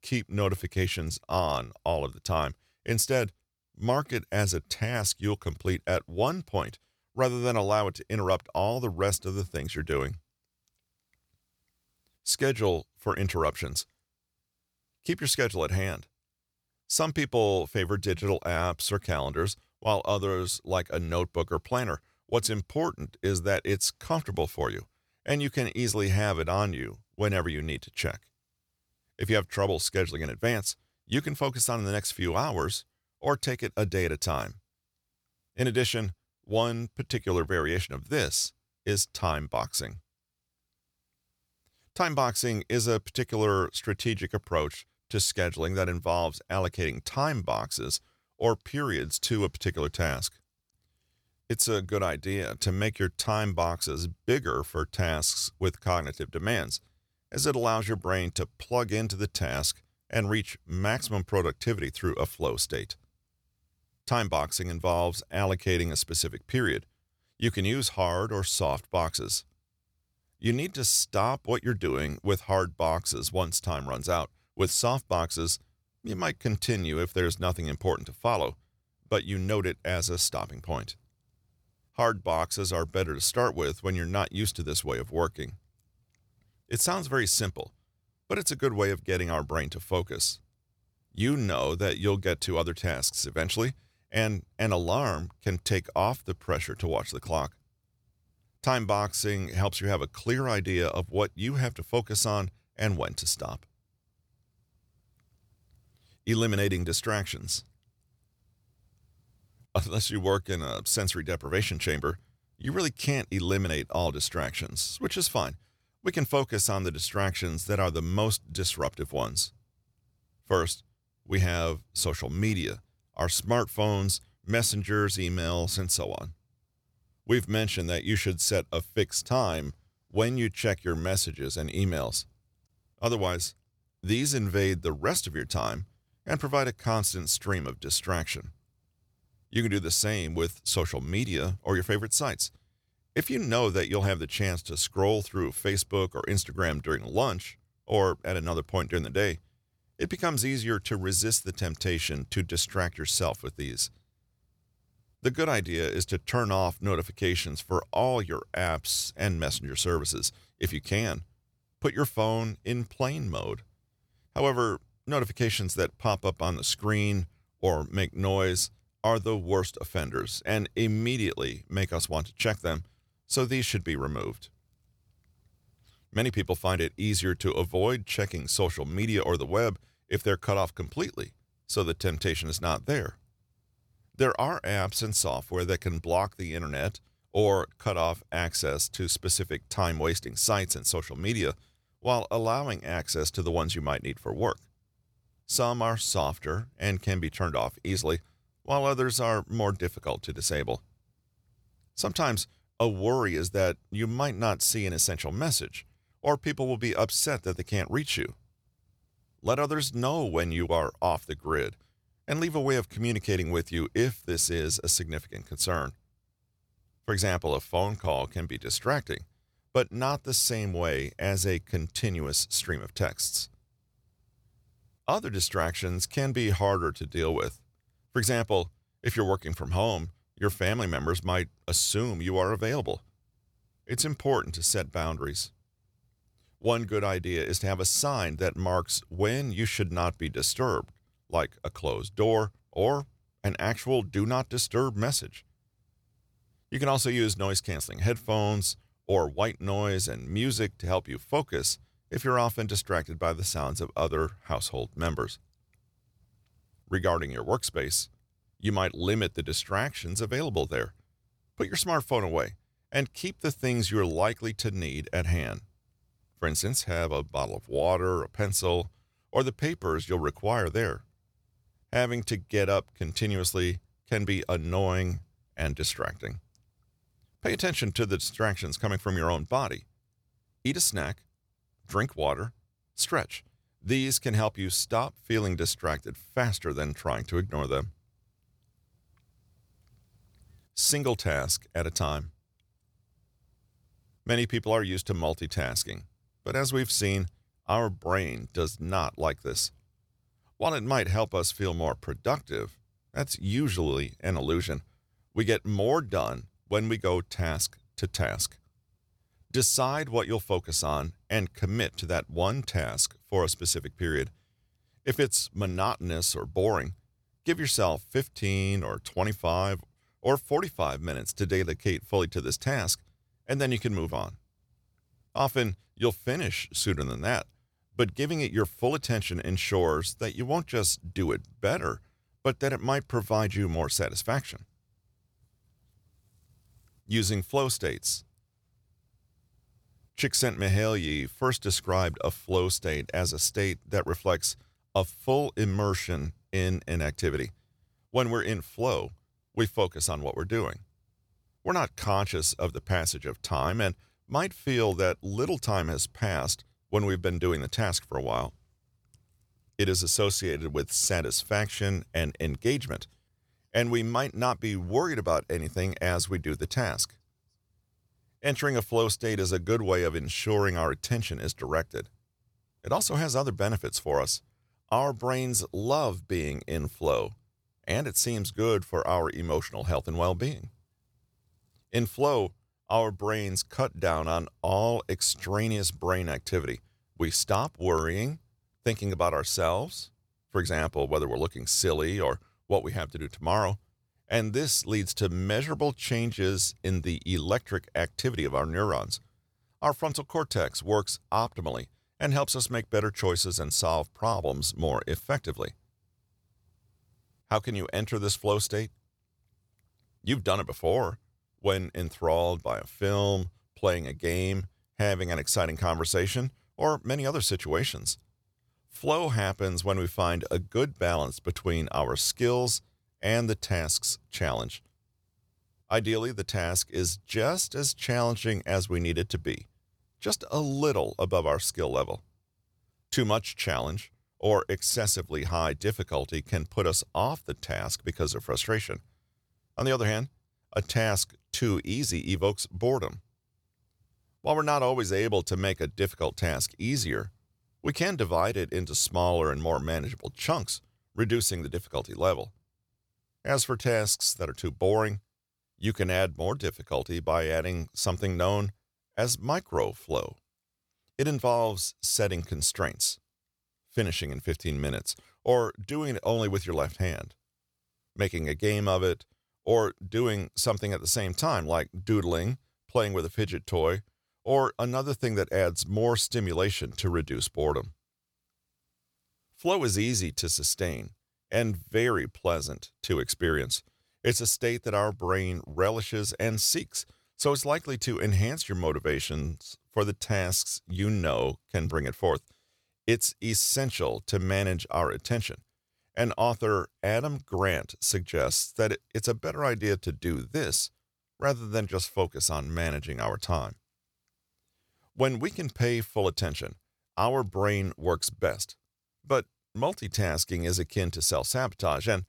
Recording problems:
none

